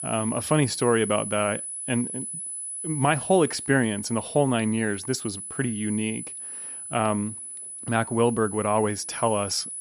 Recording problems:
high-pitched whine; loud; throughout; 10 kHz, 7 dB below the speech

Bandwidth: 14.5 kHz